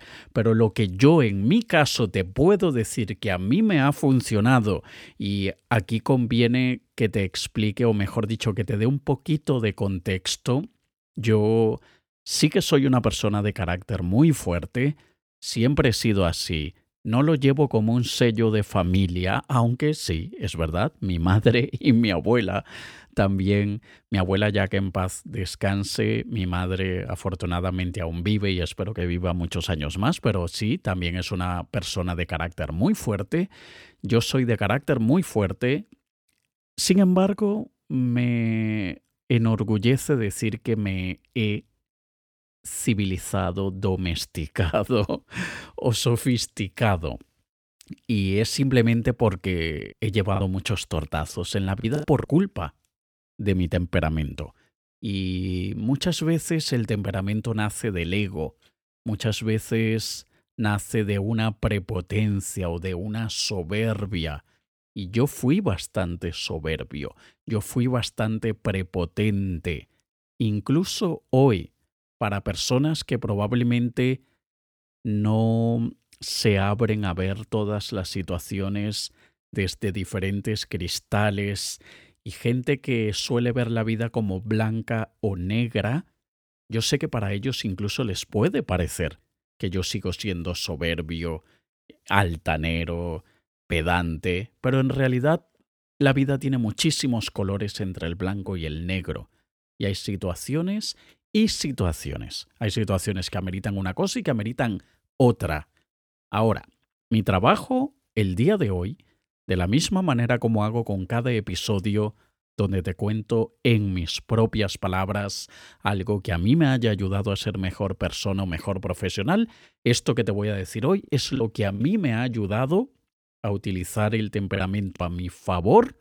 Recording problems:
choppy; very; from 50 to 52 s, at 2:01 and at 2:05; 6% of the speech affected

